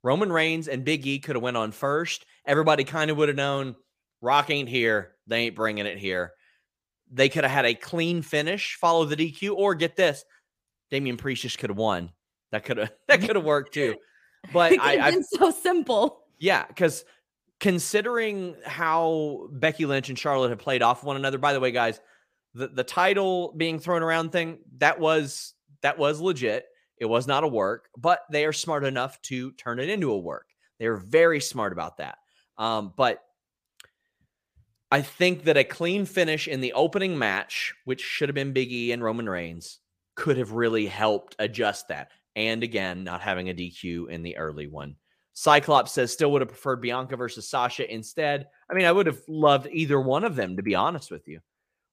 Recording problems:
none

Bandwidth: 15 kHz